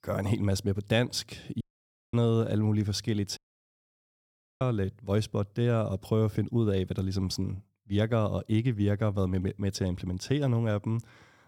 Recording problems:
audio cutting out; at 1.5 s for 0.5 s and at 3.5 s for 1 s

